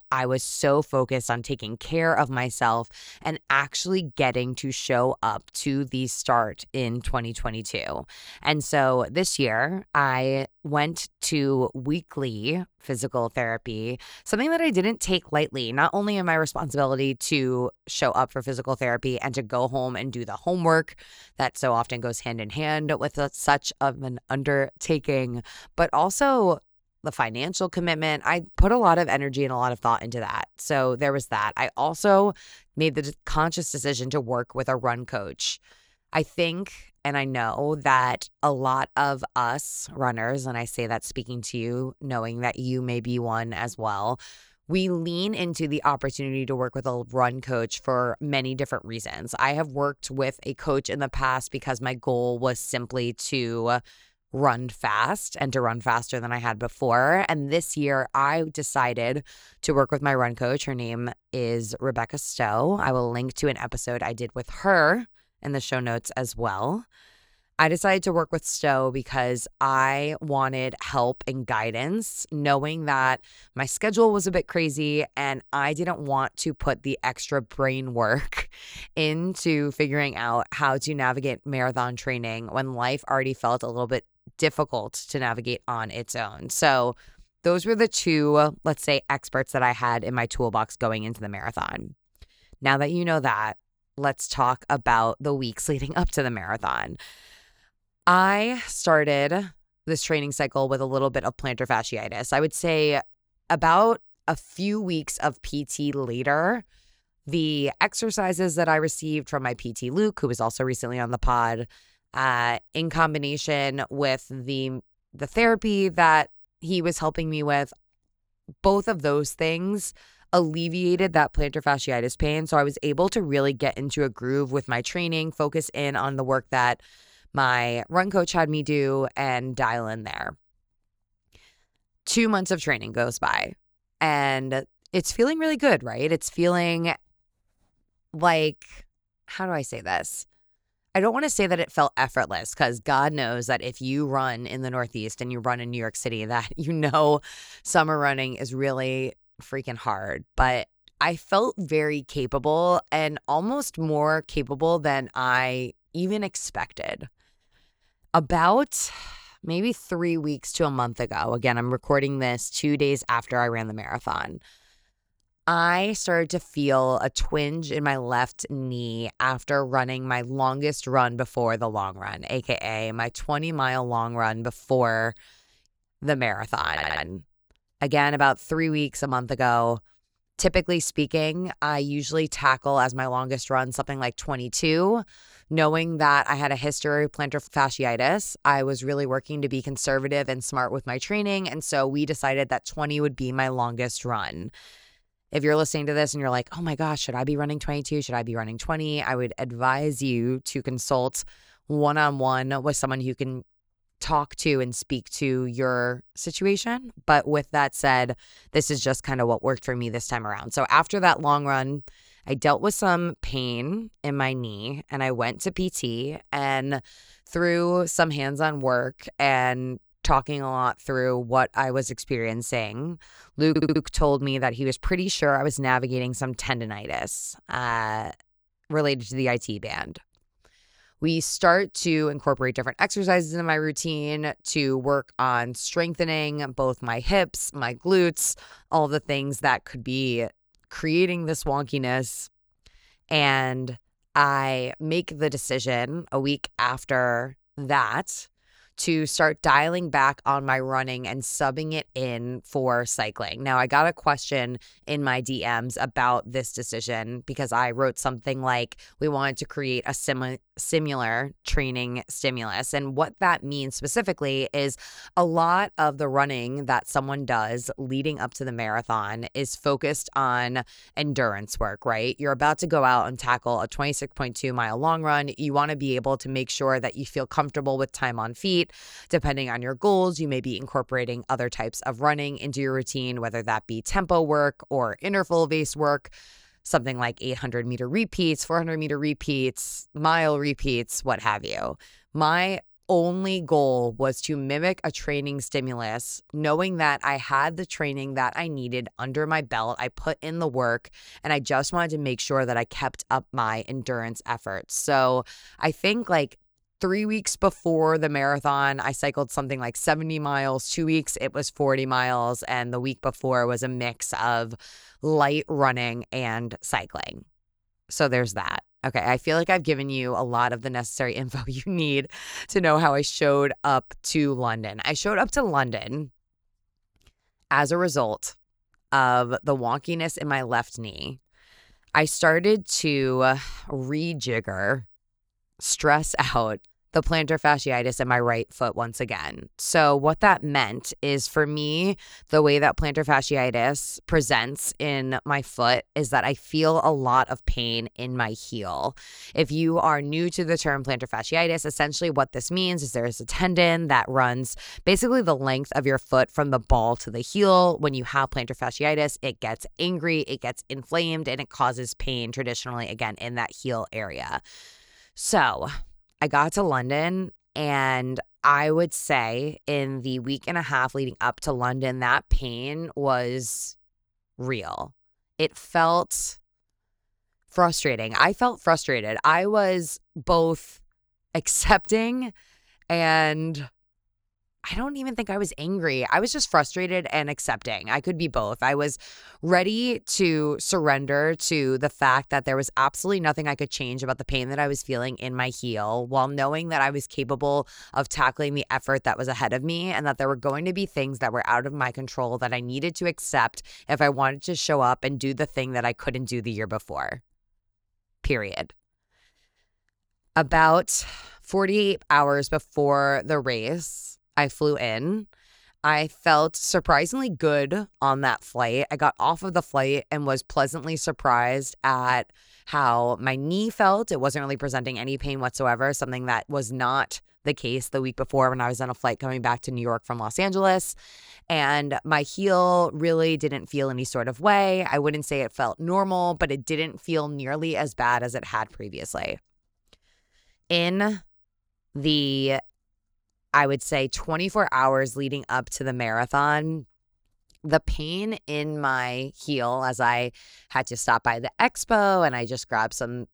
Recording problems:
audio stuttering; at 2:57 and at 3:43

